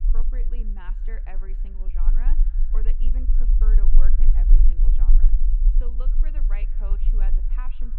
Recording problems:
muffled; very; fading above 3 kHz
echo of what is said; faint; throughout; 110 ms later, 20 dB below the speech
low rumble; loud; throughout; 3 dB below the speech

